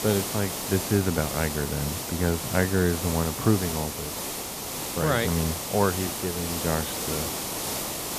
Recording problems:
high frequencies cut off; slight; nothing above 4.5 kHz
hiss; loud; throughout; 3 dB below the speech

